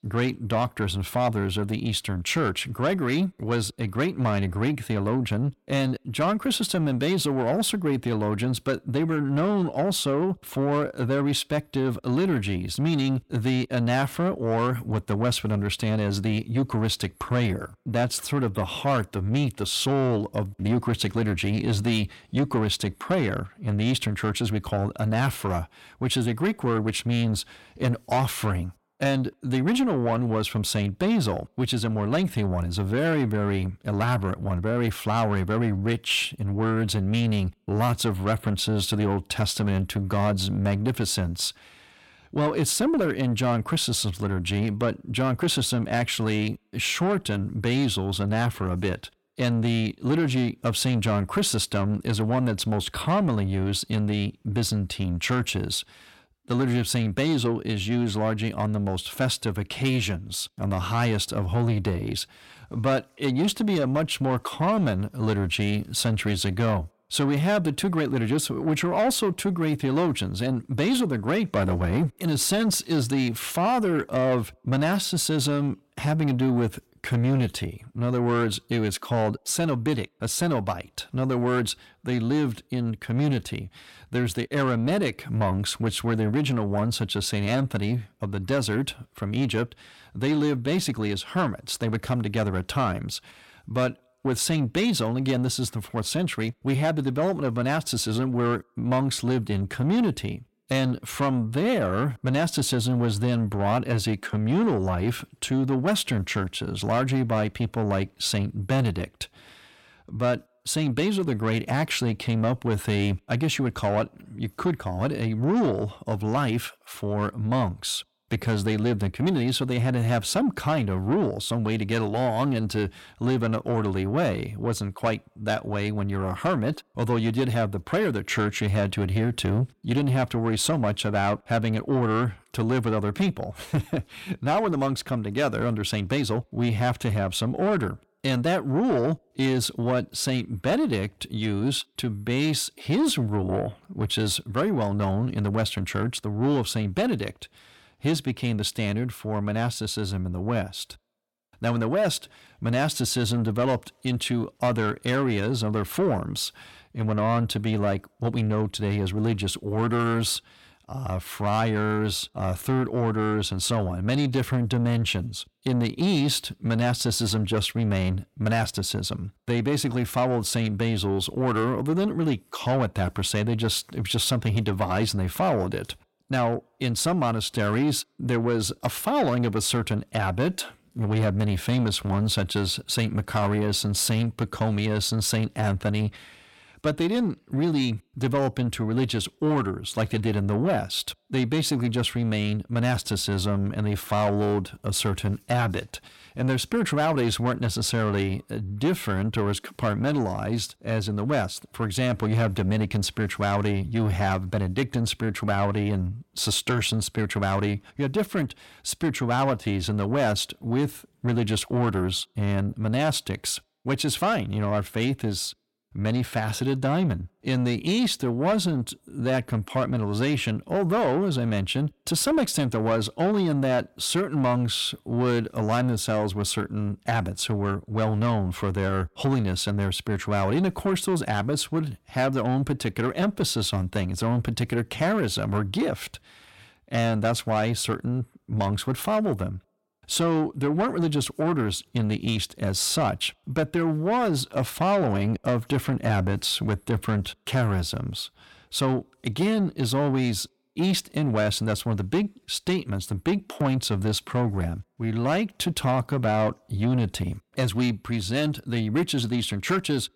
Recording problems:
distortion; slight; 10 dB below the speech

